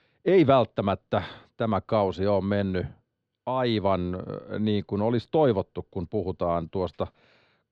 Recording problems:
muffled; slightly; fading above 3 kHz

